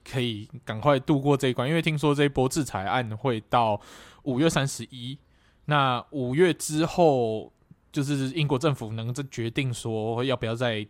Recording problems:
none

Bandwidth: 16 kHz